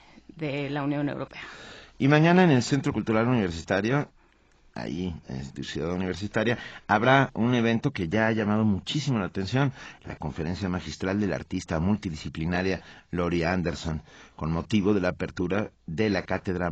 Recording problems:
garbled, watery; badly; nothing above 7.5 kHz
abrupt cut into speech; at the end

